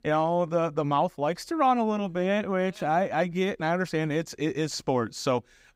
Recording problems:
none

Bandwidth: 15.5 kHz